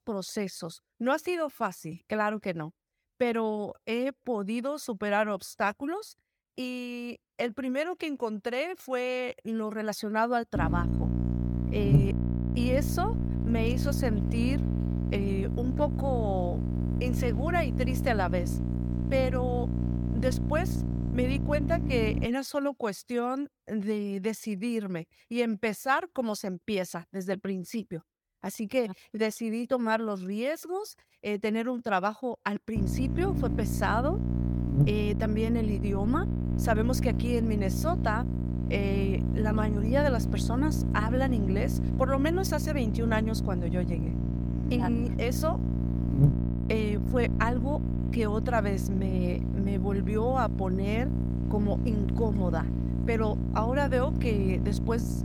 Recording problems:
electrical hum; loud; from 11 to 22 s and from 33 s on; 60 Hz, 7 dB below the speech

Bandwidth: 18 kHz